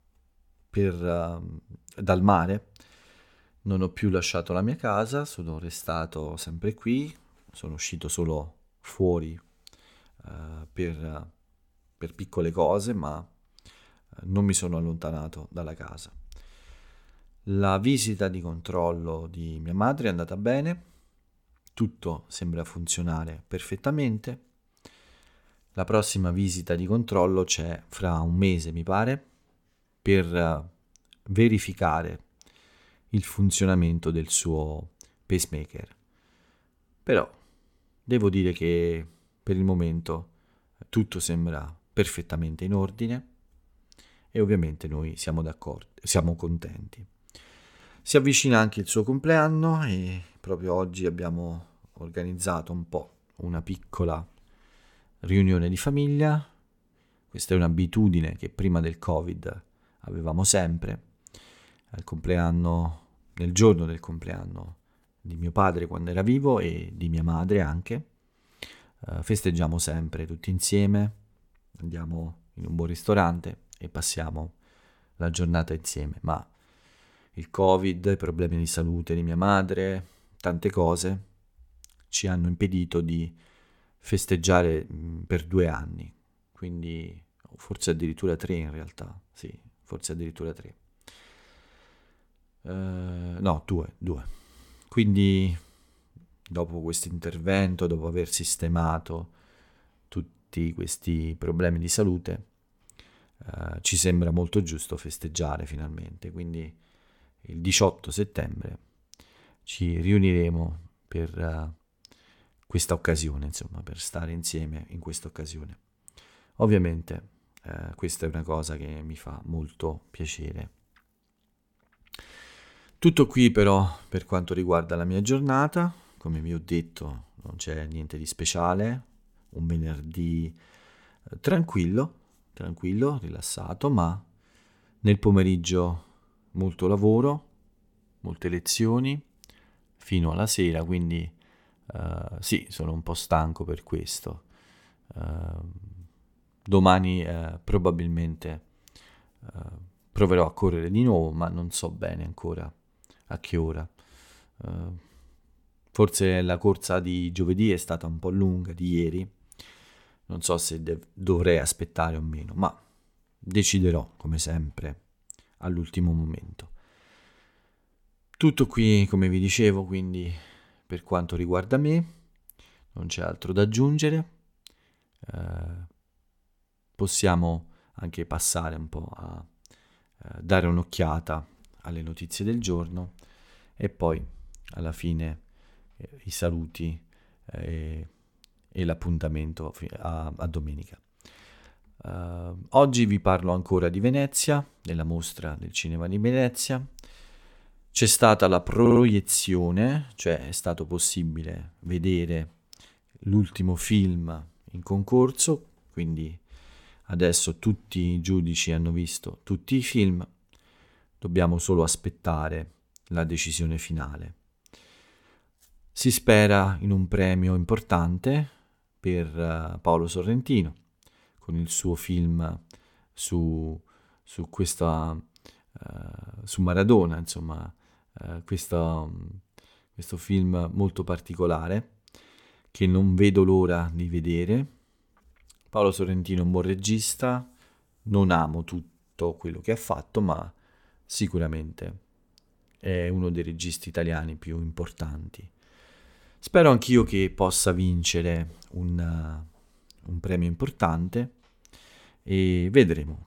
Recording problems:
audio stuttering; at 3:19

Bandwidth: 17.5 kHz